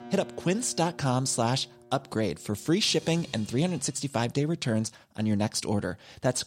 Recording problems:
background music; faint; until 4 s; 20 dB below the speech

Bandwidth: 16 kHz